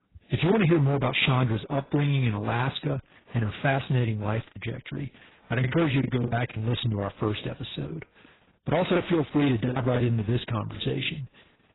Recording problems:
garbled, watery; badly; nothing above 4 kHz
distortion; slight; 8% of the sound clipped
choppy; very; from 4.5 to 6.5 s and from 9 to 11 s; 11% of the speech affected

